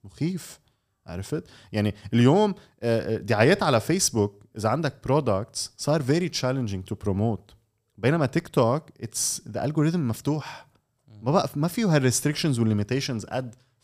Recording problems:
none

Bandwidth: 15 kHz